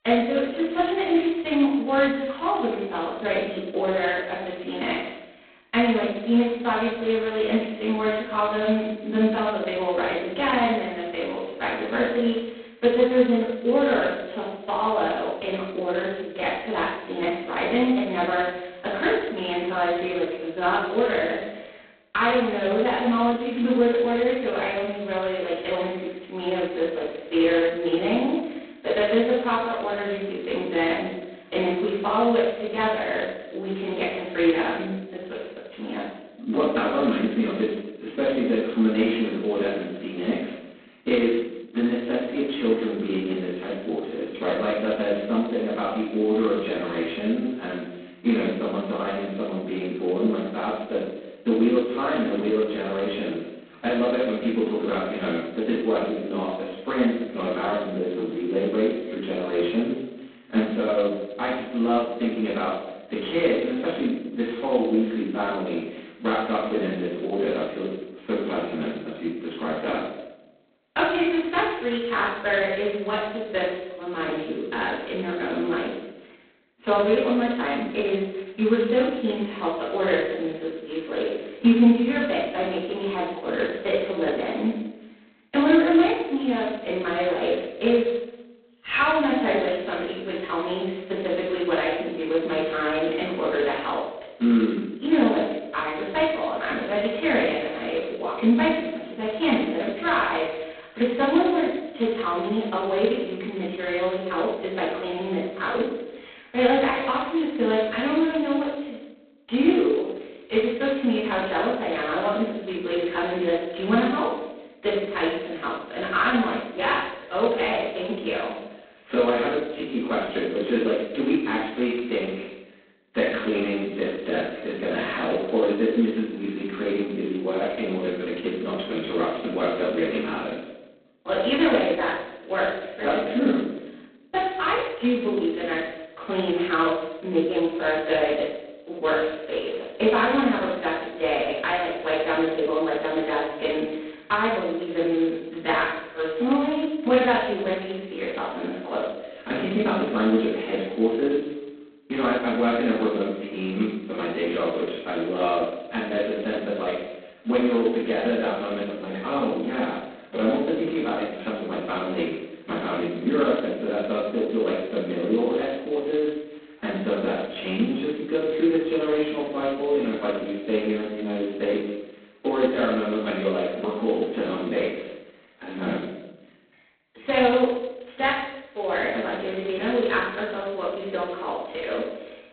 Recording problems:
phone-call audio; poor line; nothing above 4 kHz
off-mic speech; far
room echo; noticeable; dies away in 0.8 s

